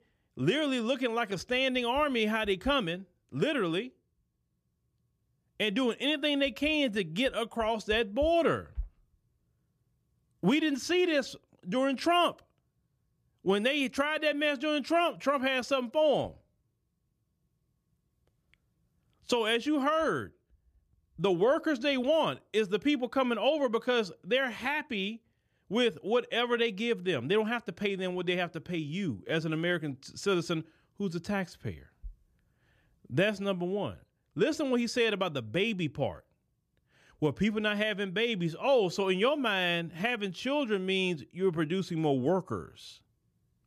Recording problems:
none

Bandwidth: 14.5 kHz